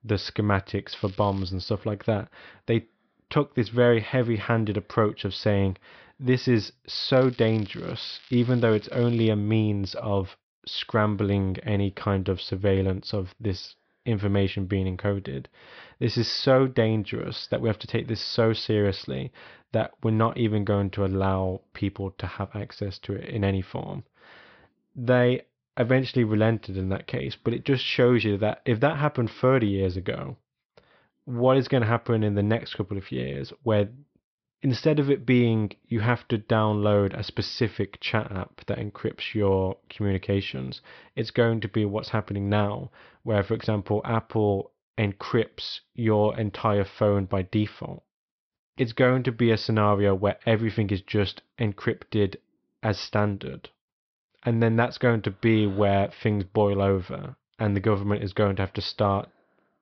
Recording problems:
high frequencies cut off; noticeable; nothing above 5.5 kHz
crackling; faint; at 1 s and from 7 to 9.5 s; 25 dB below the speech

